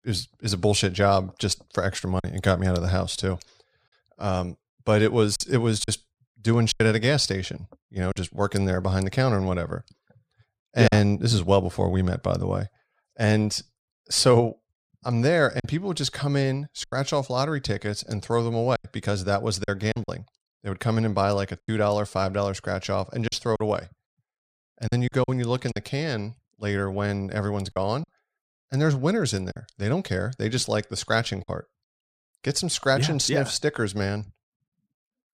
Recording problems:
choppy; occasionally; 4% of the speech affected

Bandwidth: 15 kHz